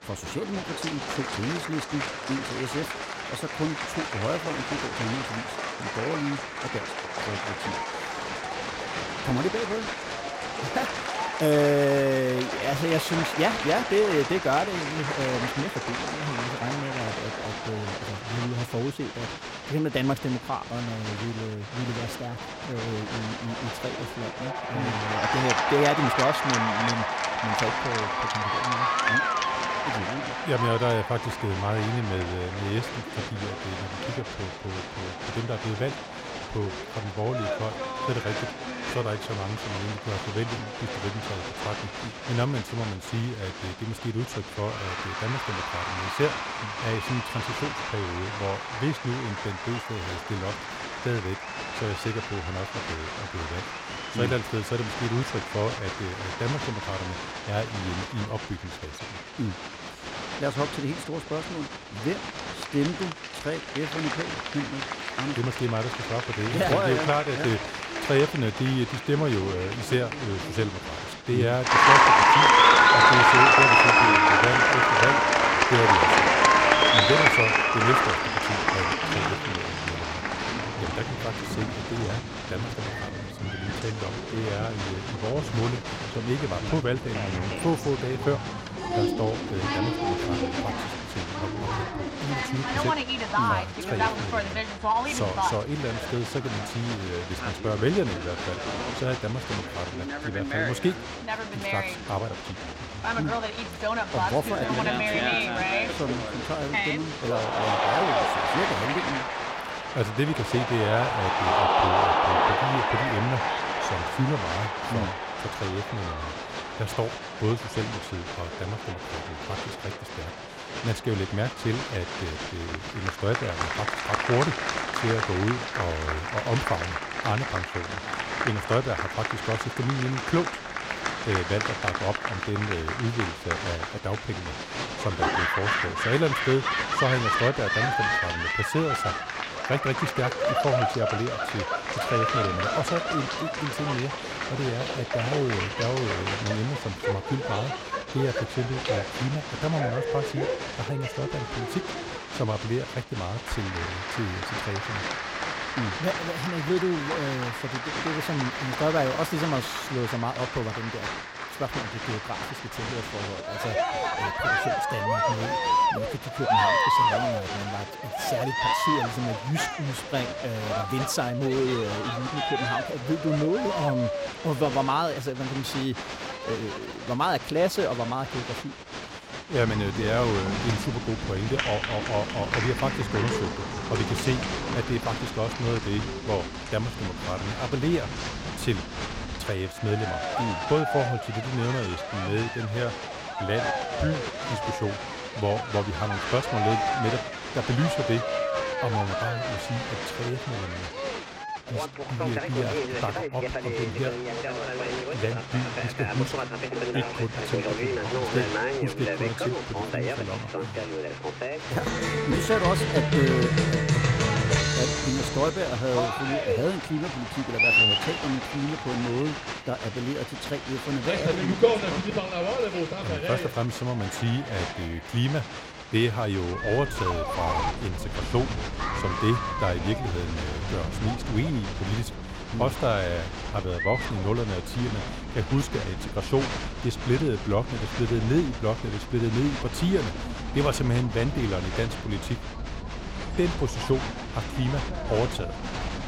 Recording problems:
crowd noise; very loud; throughout; 2 dB above the speech

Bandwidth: 16 kHz